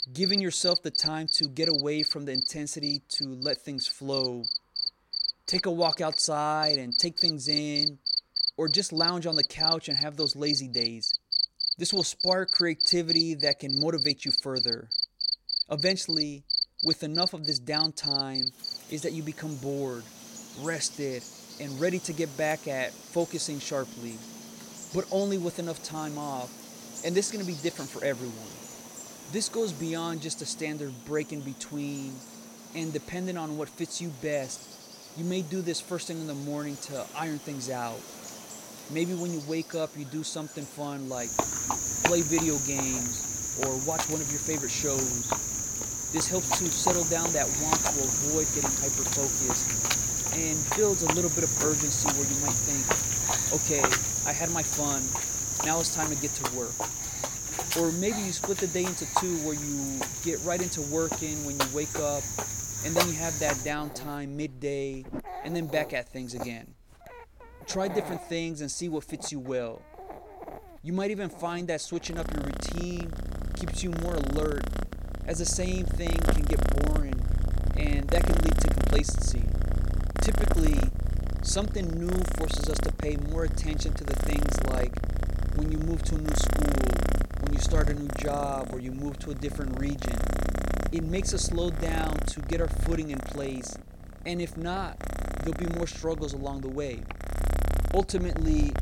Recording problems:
animal sounds; very loud; throughout; 4 dB above the speech

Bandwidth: 16.5 kHz